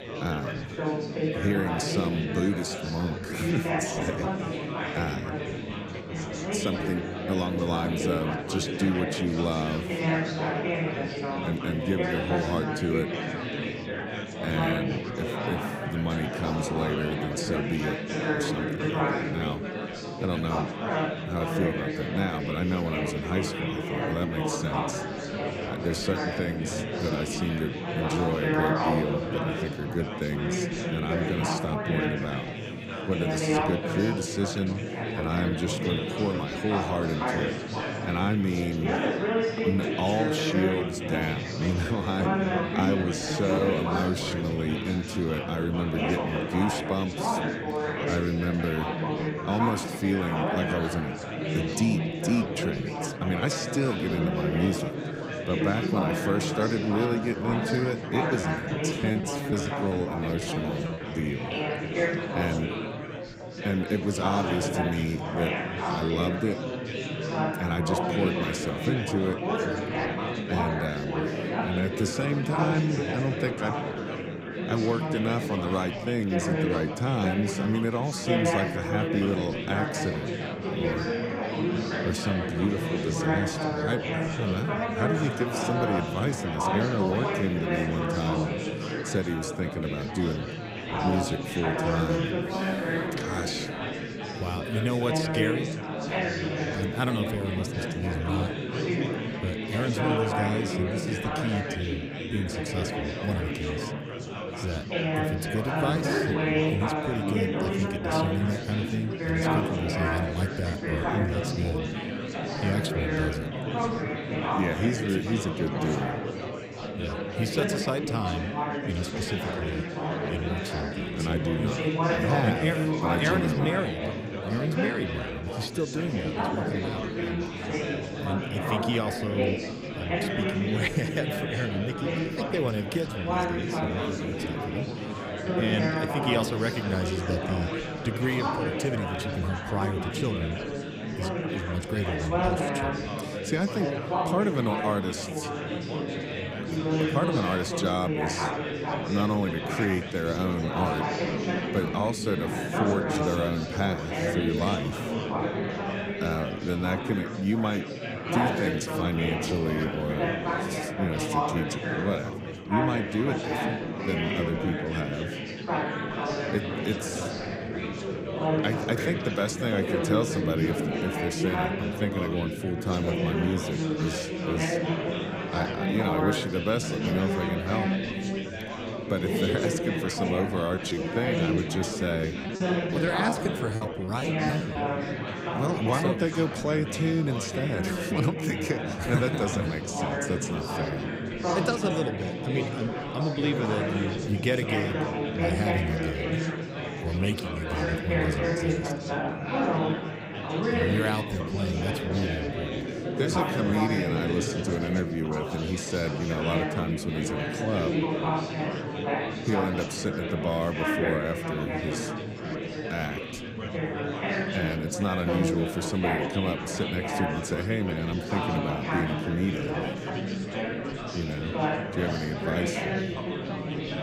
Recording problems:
chatter from many people; very loud; throughout; as loud as the speech
choppy; very; from 58 s to 1:01 and from 3:01 to 3:05; 13% of the speech affected

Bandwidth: 15.5 kHz